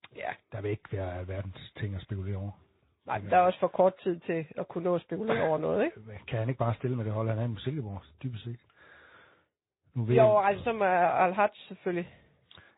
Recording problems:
high frequencies cut off; severe; nothing above 4 kHz
garbled, watery; slightly

